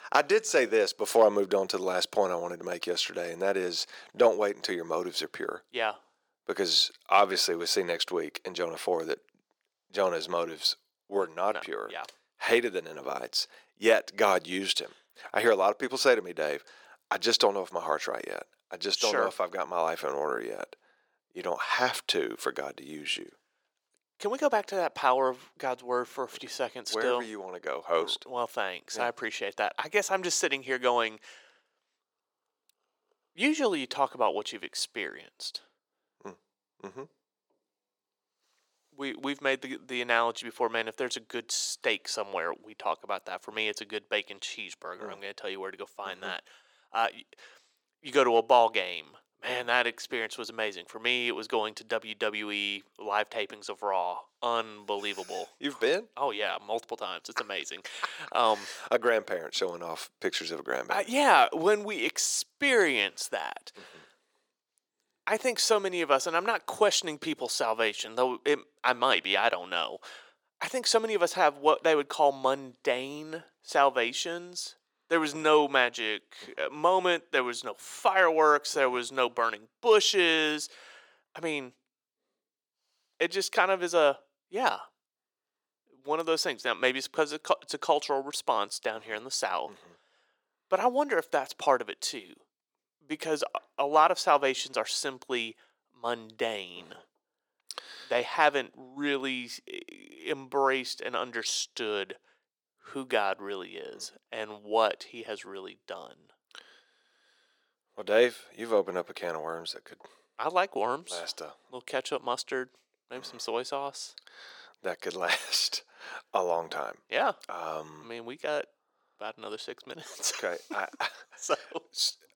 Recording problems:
thin; very; fading below 400 Hz

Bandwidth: 17.5 kHz